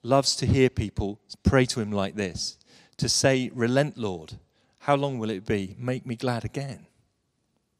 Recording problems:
none

